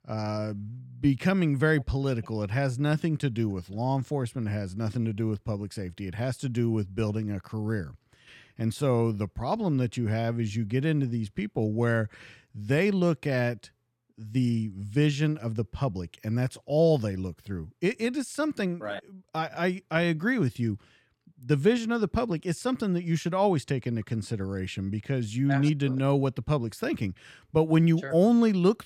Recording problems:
none

